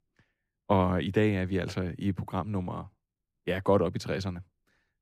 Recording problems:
none

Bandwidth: 15 kHz